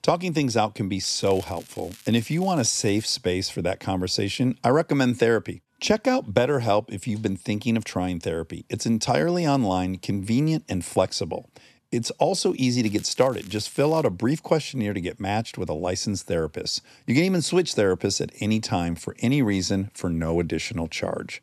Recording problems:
crackling; faint; from 1 to 3 s and from 13 to 14 s; 25 dB below the speech

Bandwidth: 13.5 kHz